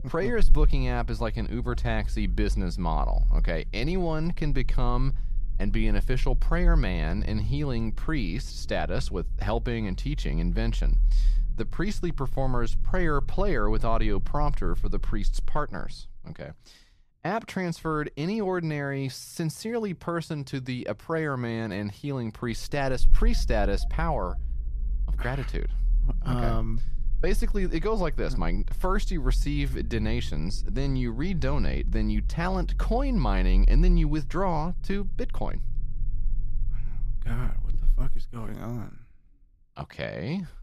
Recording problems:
low rumble; faint; throughout; 20 dB below the speech

